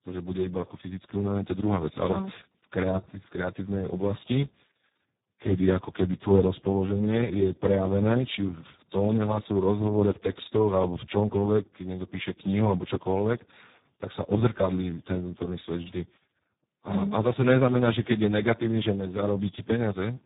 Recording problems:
garbled, watery; badly; nothing above 4 kHz

